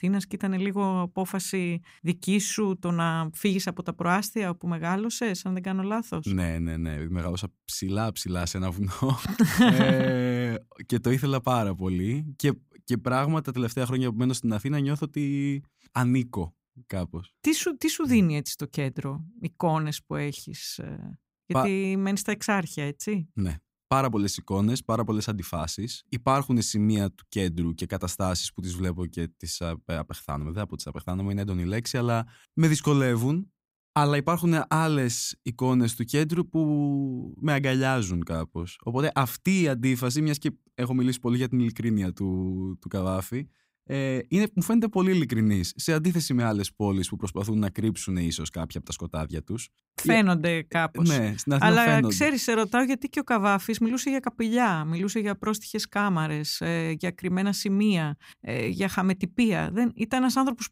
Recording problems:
none

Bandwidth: 15.5 kHz